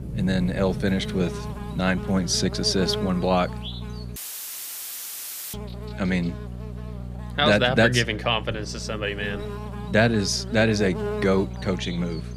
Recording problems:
electrical hum; noticeable; throughout; 60 Hz, 15 dB below the speech
rain or running water; noticeable; throughout; 15 dB below the speech
audio cutting out; filled with static; at 4 s for 1.5 s

